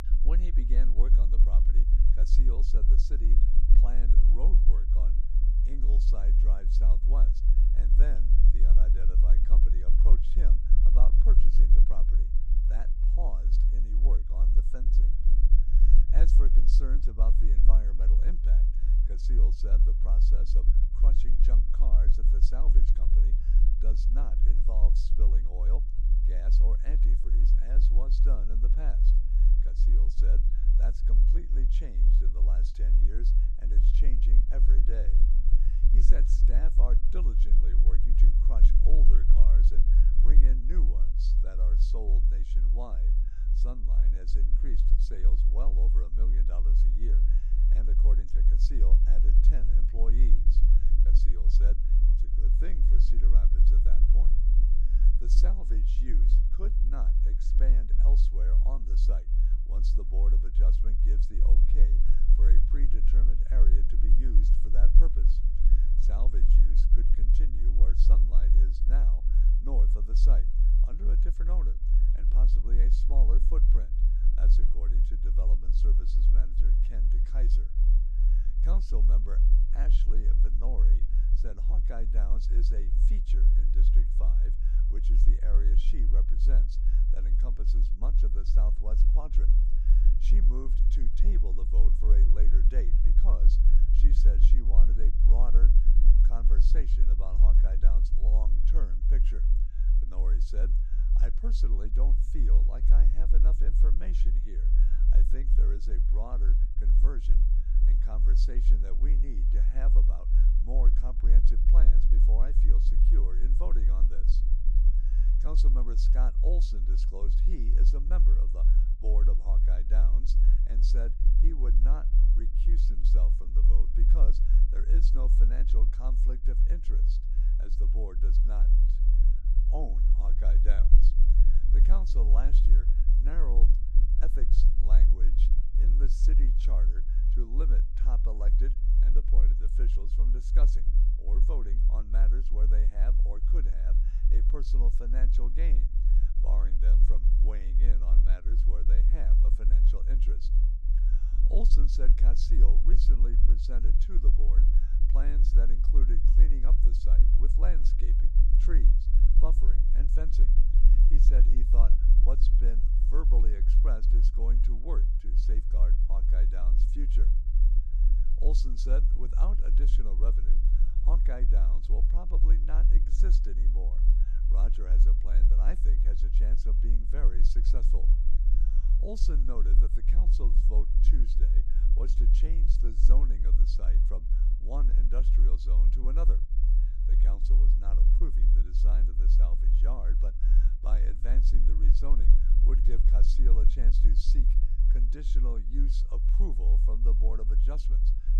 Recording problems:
low rumble; loud; throughout; 3 dB below the speech

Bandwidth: 15 kHz